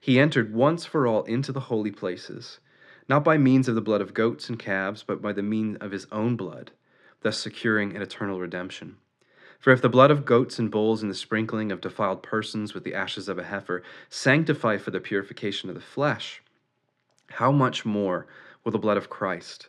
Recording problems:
muffled; slightly; fading above 2.5 kHz

